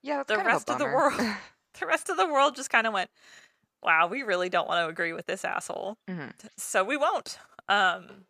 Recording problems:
none

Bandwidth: 14.5 kHz